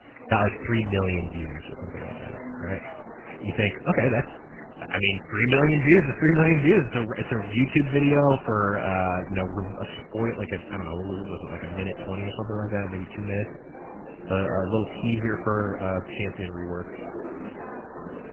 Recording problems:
garbled, watery; badly; nothing above 3 kHz
chatter from many people; noticeable; throughout; 15 dB below the speech

